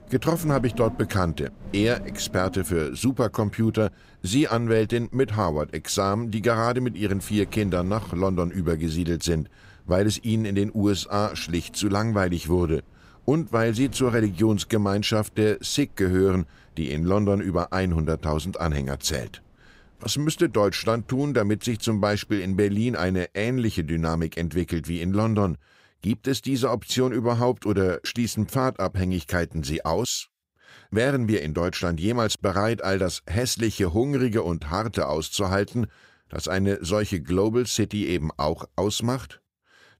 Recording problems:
wind noise on the microphone; occasional gusts; until 23 s; 25 dB below the speech

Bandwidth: 15.5 kHz